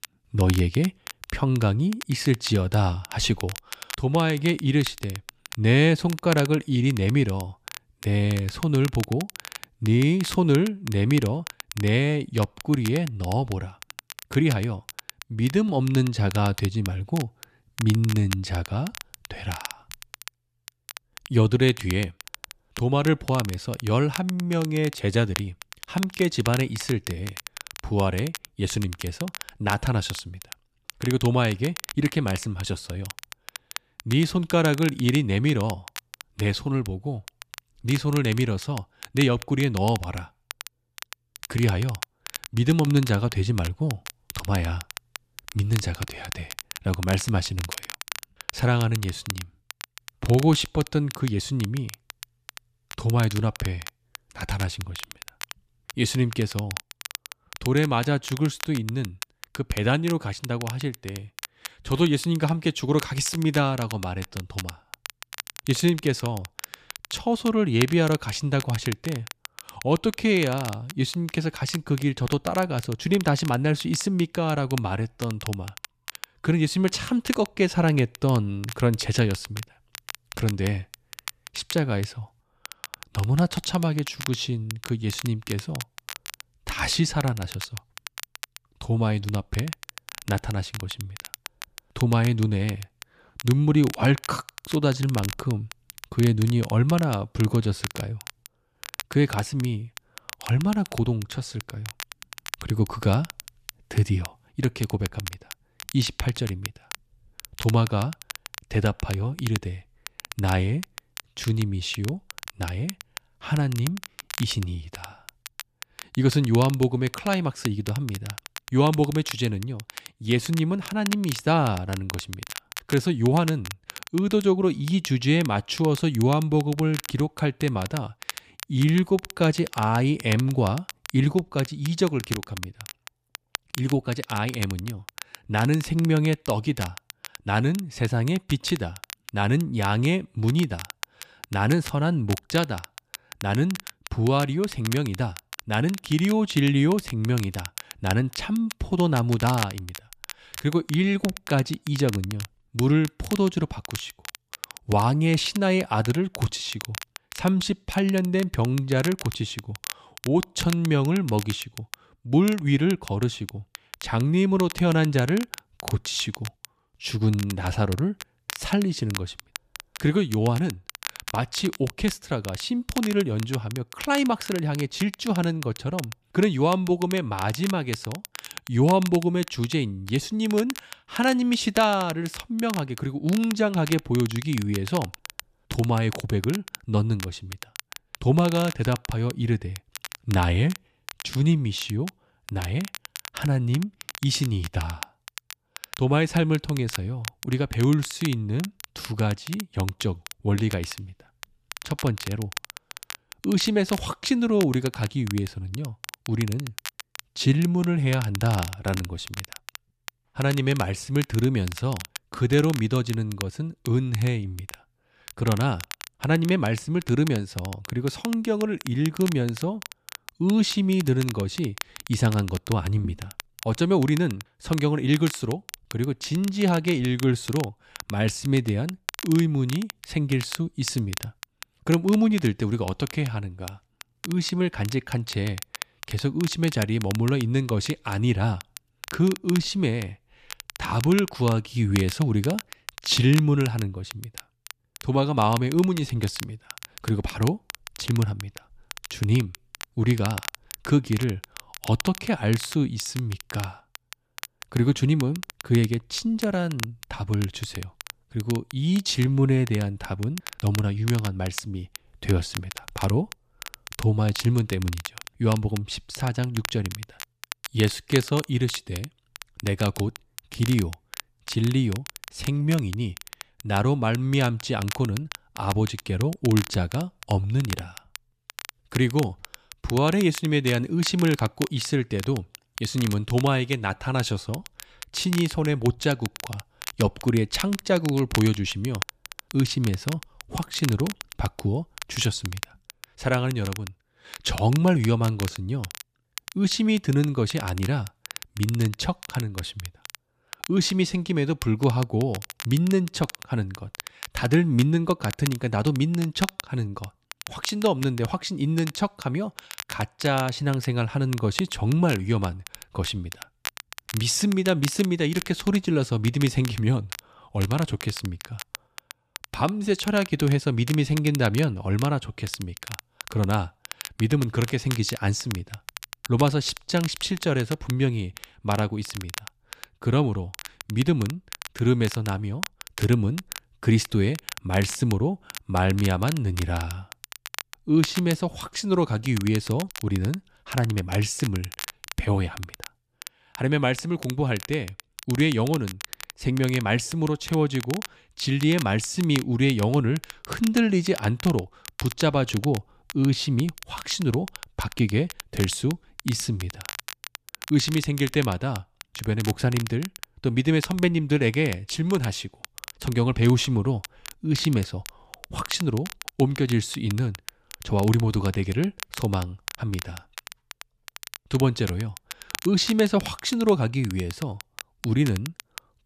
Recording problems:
crackle, like an old record; noticeable; 15 dB below the speech

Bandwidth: 14.5 kHz